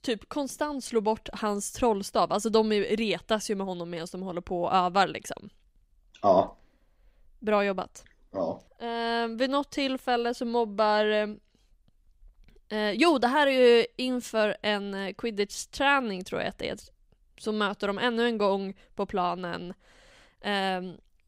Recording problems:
none

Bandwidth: 15.5 kHz